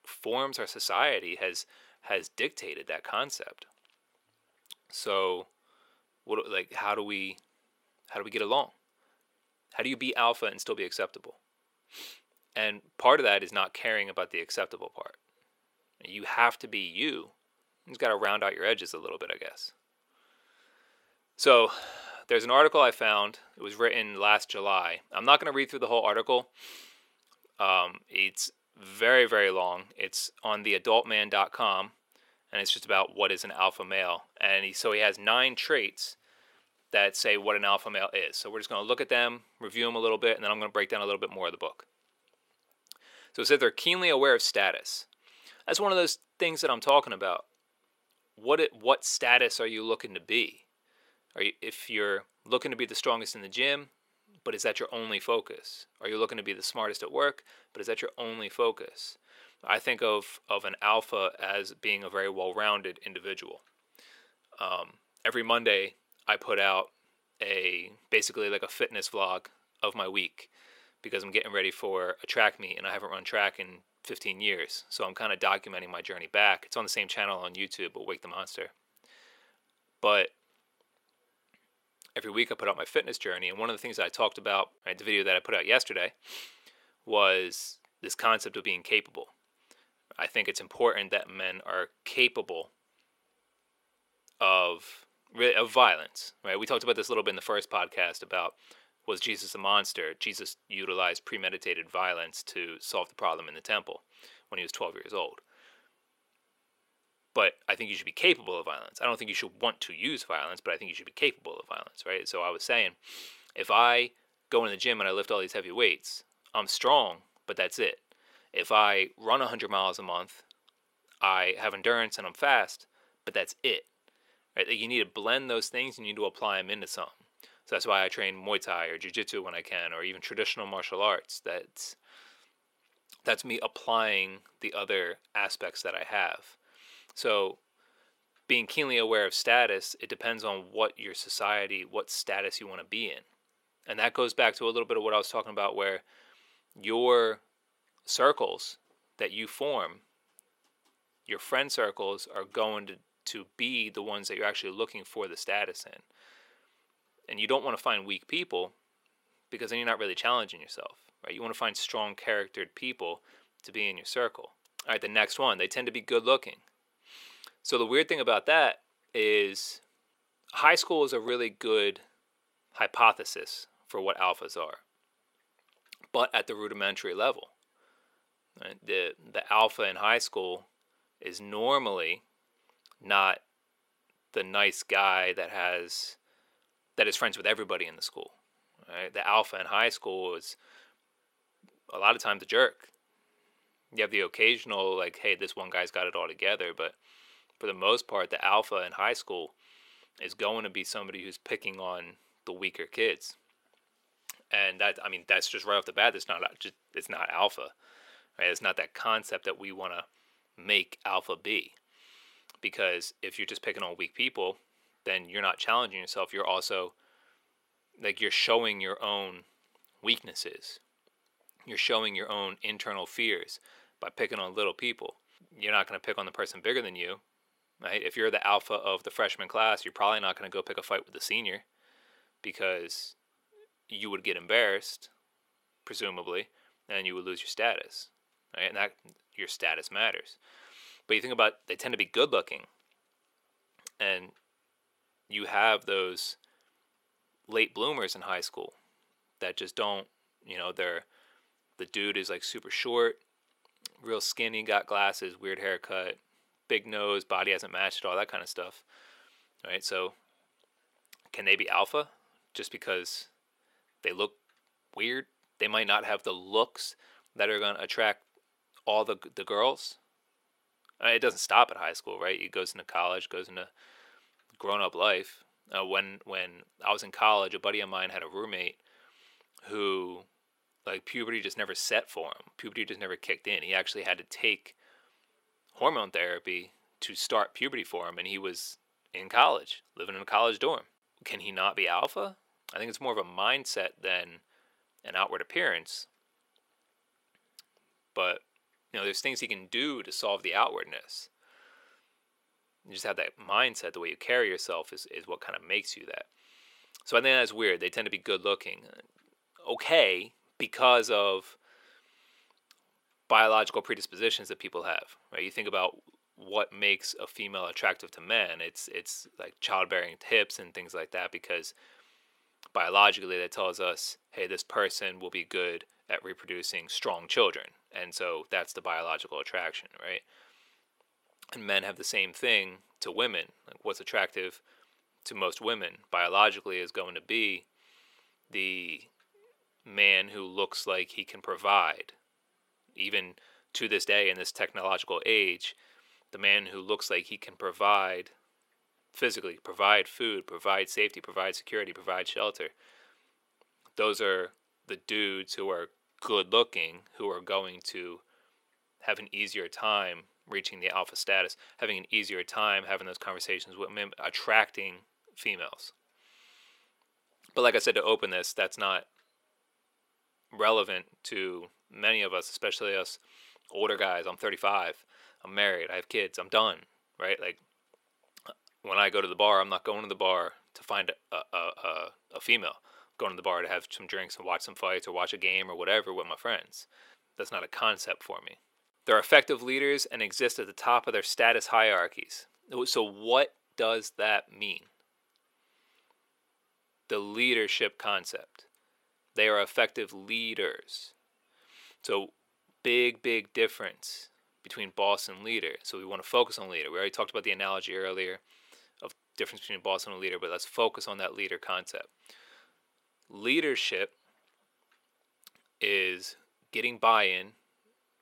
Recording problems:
thin; somewhat; fading below 500 Hz

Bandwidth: 16 kHz